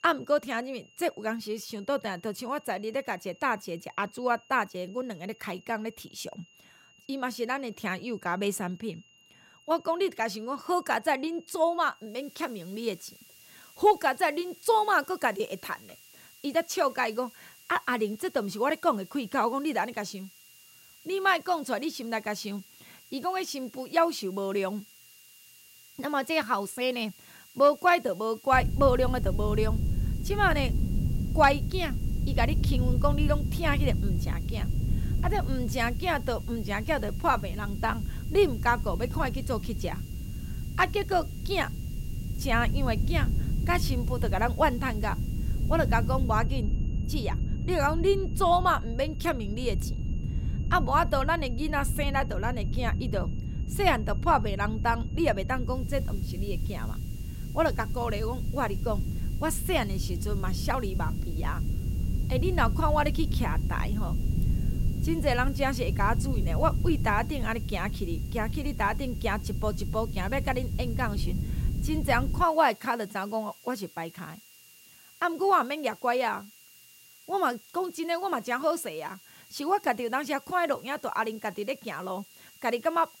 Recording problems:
wind noise on the microphone; occasional gusts; from 29 s to 1:12; 15 dB below the speech
high-pitched whine; faint; throughout; 3 kHz, 30 dB below the speech
hiss; faint; from 12 to 46 s and from 56 s on; 25 dB below the speech

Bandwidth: 16 kHz